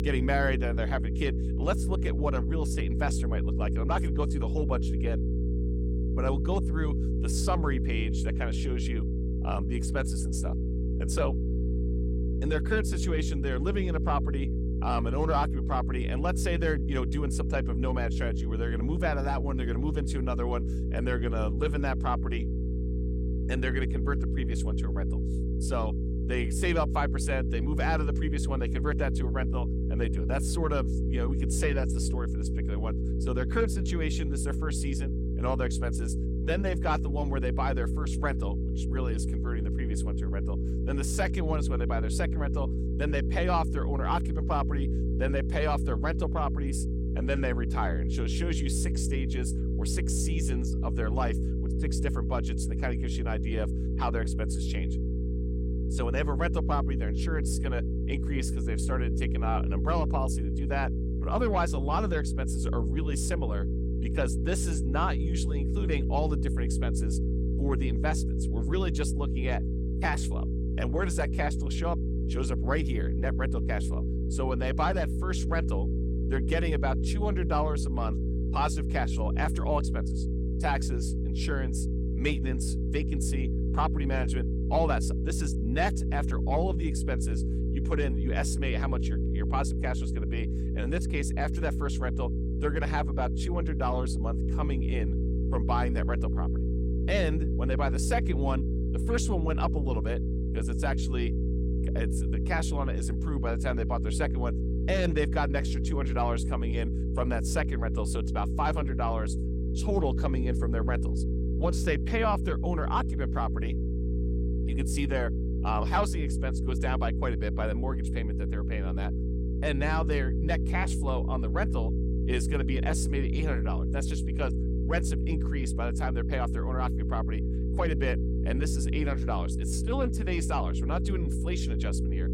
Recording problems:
electrical hum; loud; throughout; 60 Hz, 7 dB below the speech

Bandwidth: 17 kHz